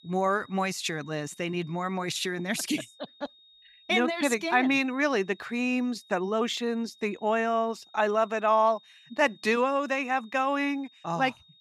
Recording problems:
high-pitched whine; faint; throughout; 3.5 kHz, 25 dB below the speech

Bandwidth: 15.5 kHz